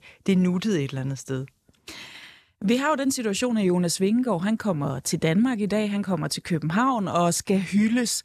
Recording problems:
none

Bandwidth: 13.5 kHz